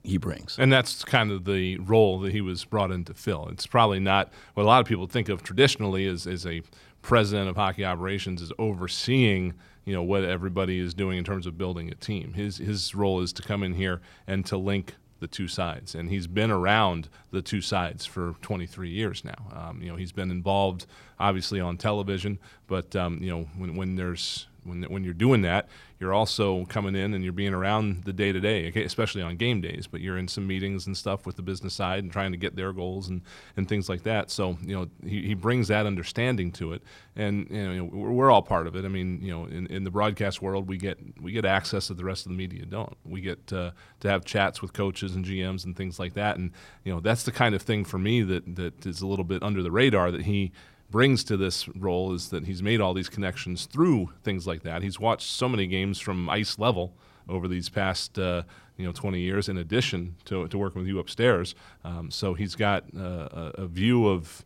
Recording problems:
none

